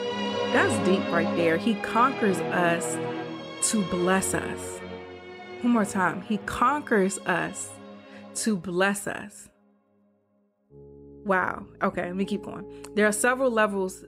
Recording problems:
background music; loud; throughout; 7 dB below the speech

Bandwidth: 15.5 kHz